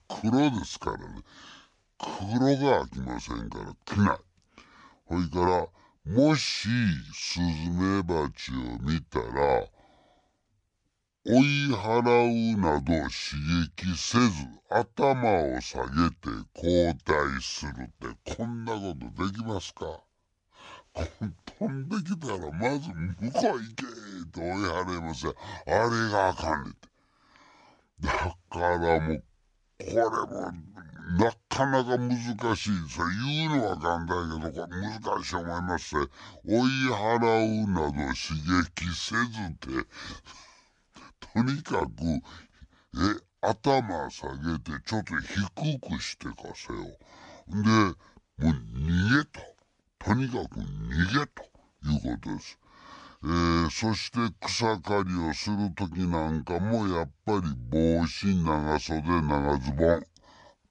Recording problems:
wrong speed and pitch; too slow and too low; 0.7 times normal speed

